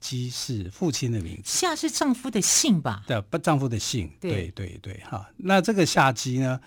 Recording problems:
none

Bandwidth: 18 kHz